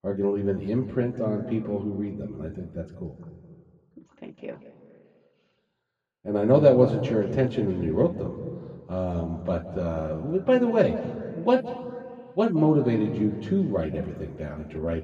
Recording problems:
muffled; very; fading above 3 kHz
room echo; noticeable; dies away in 1.6 s
off-mic speech; somewhat distant

